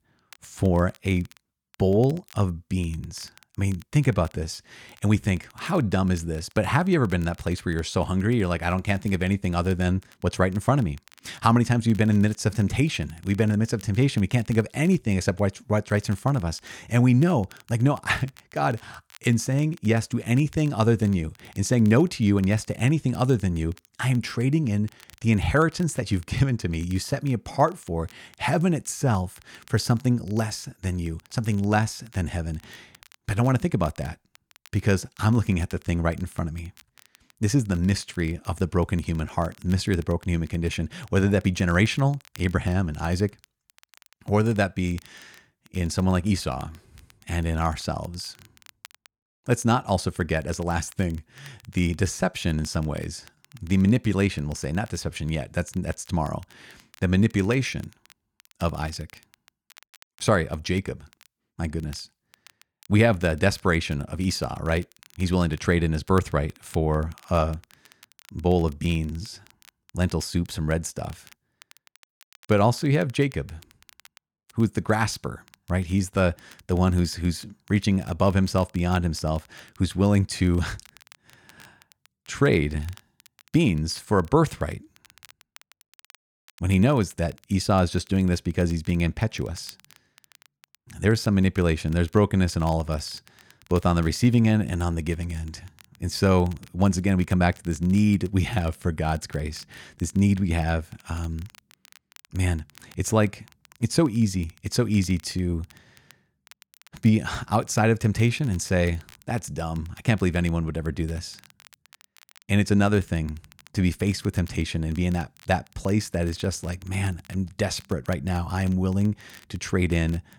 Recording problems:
crackle, like an old record; faint; 30 dB below the speech

